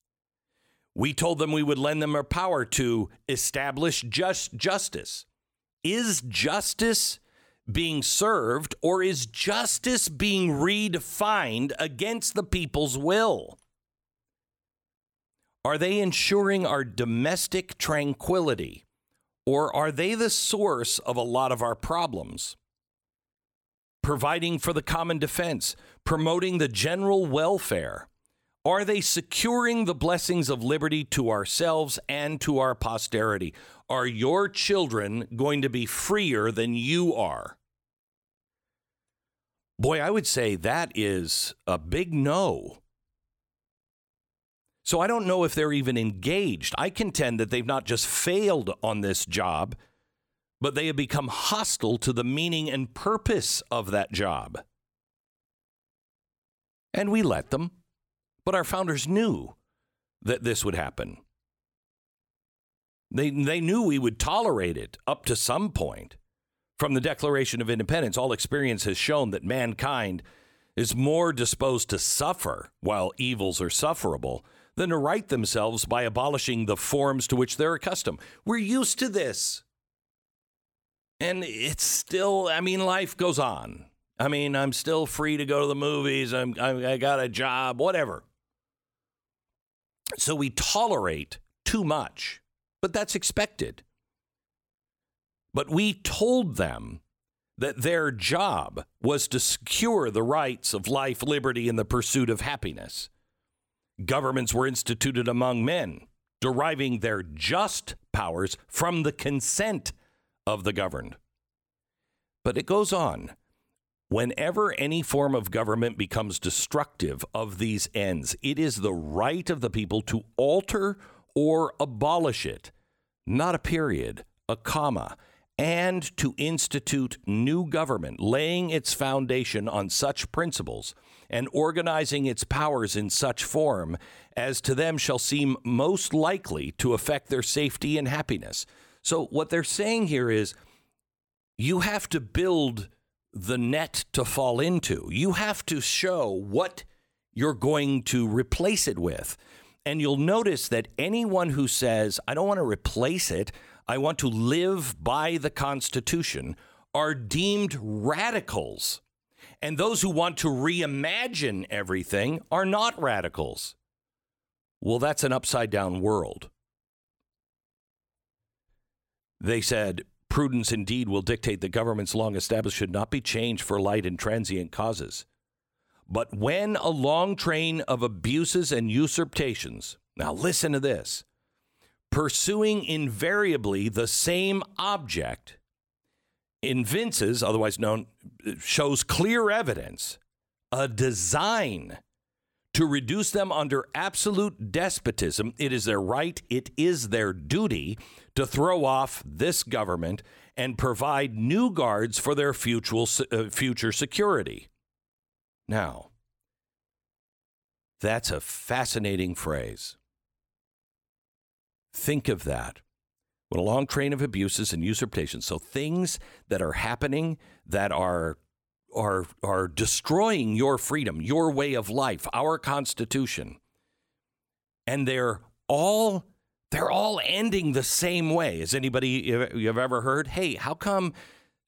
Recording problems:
none

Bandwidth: 17.5 kHz